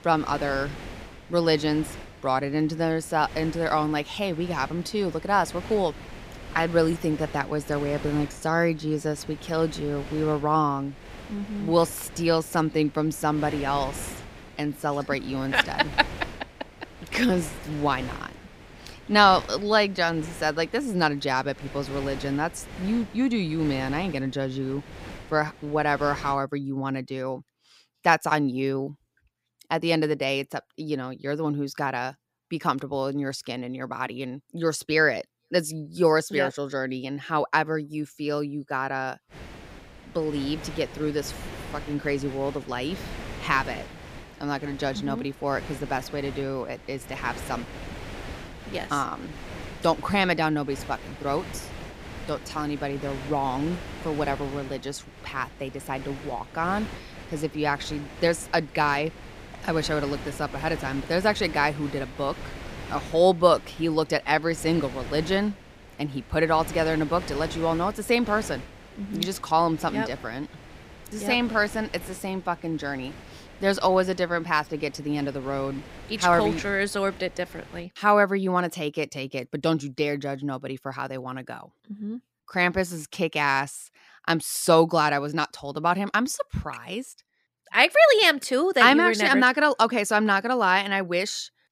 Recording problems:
wind noise on the microphone; occasional gusts; until 26 s and from 39 s to 1:18; 15 dB below the speech

